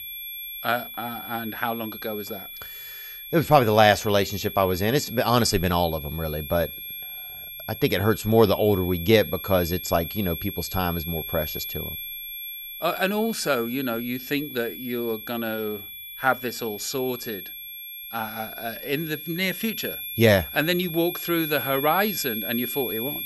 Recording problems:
high-pitched whine; loud; throughout; 11.5 kHz, 8 dB below the speech

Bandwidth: 15 kHz